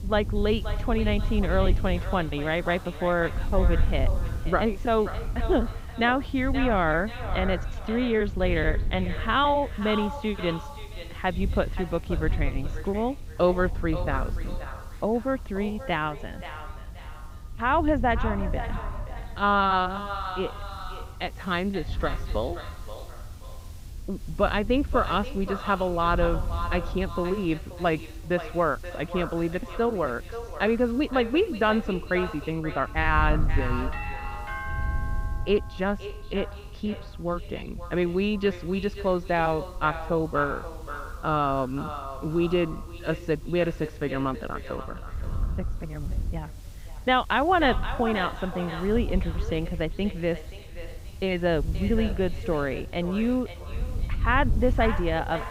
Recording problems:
echo of what is said; noticeable; throughout; 530 ms later, 10 dB below the speech
muffled; slightly; fading above 3.5 kHz
high frequencies cut off; slight; nothing above 8 kHz
wind noise on the microphone; occasional gusts; 25 dB below the speech
hiss; faint; throughout; 30 dB below the speech
doorbell; noticeable; from 34 to 36 s; peak 7 dB below the speech

